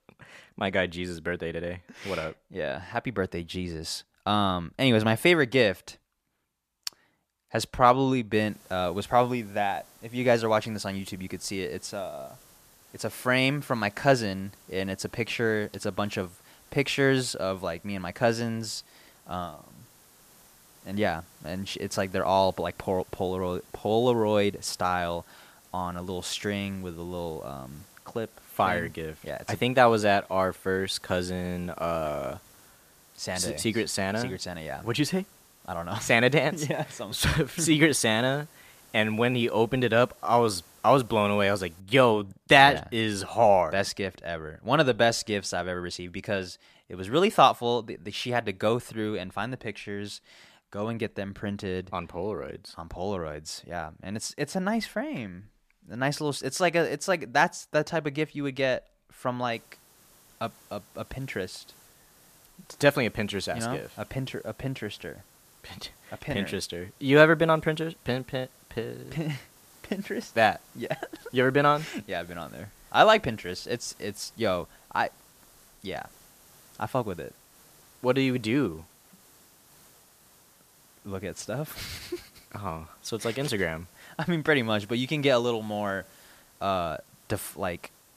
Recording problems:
hiss; faint; from 8.5 to 42 s and from 1:00 on; 25 dB below the speech

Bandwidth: 14.5 kHz